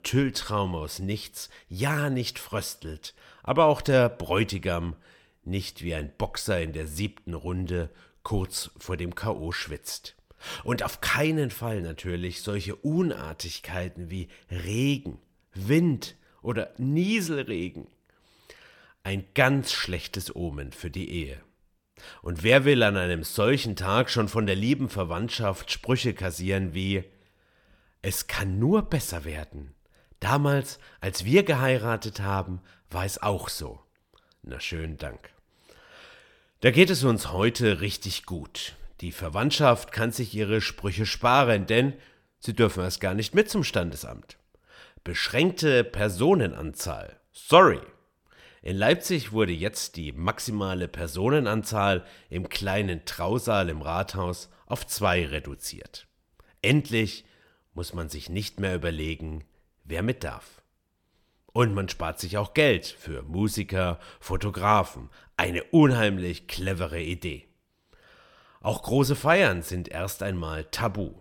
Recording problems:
none

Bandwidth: 17.5 kHz